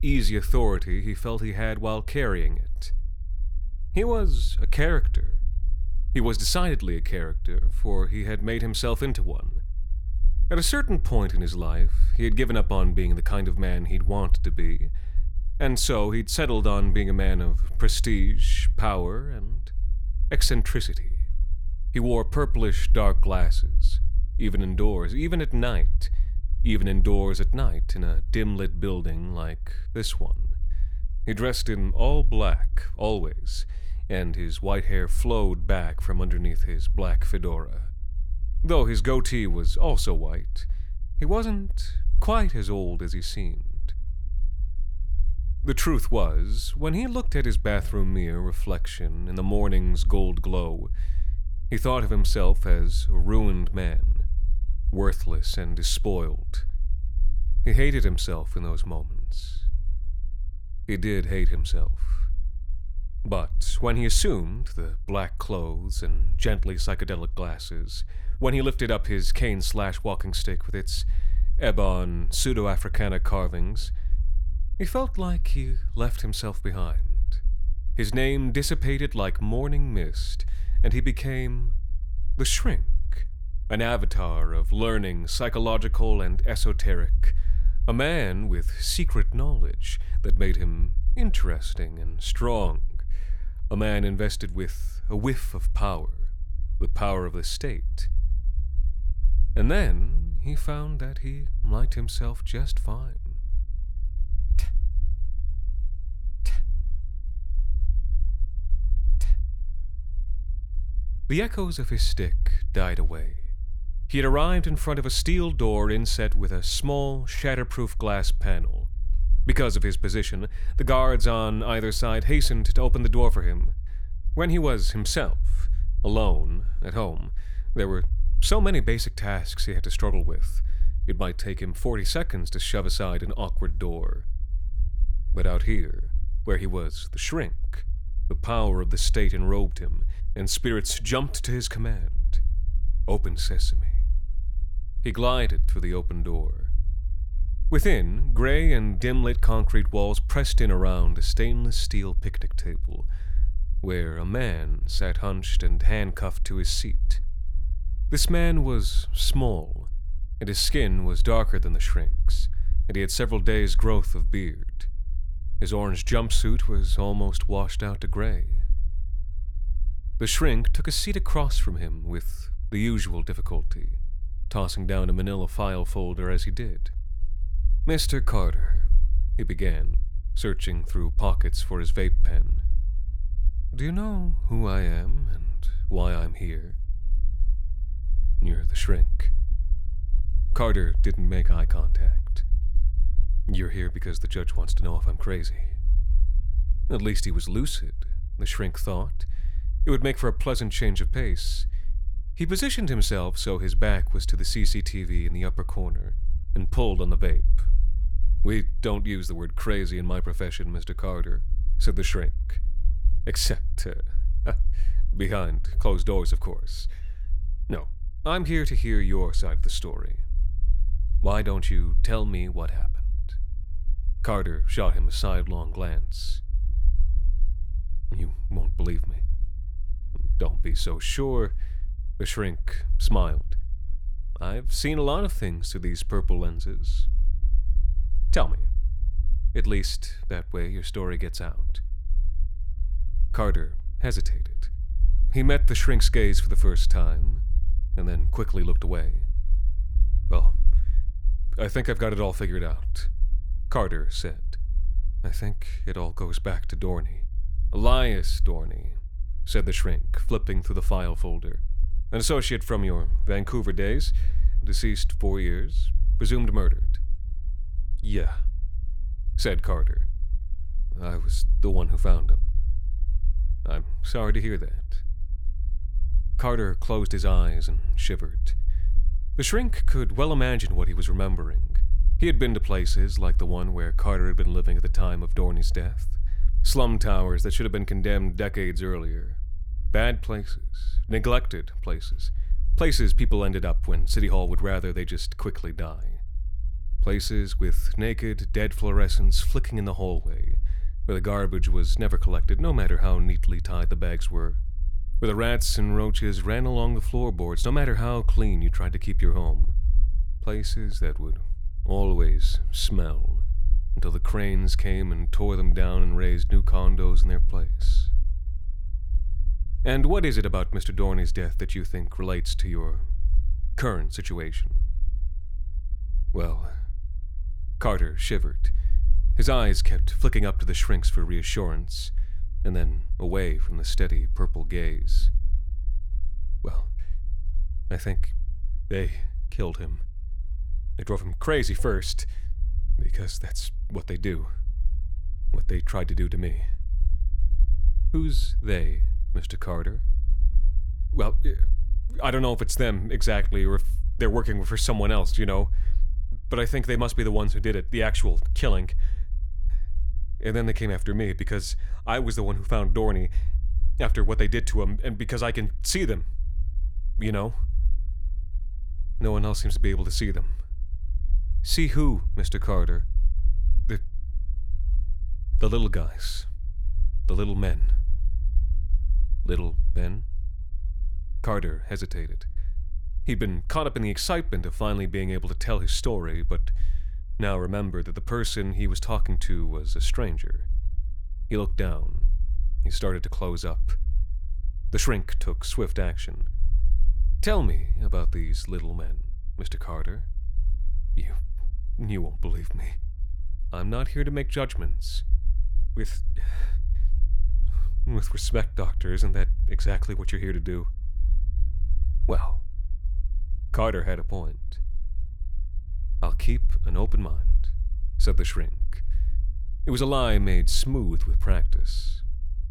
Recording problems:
low rumble; faint; throughout; 20 dB below the speech

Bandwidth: 18.5 kHz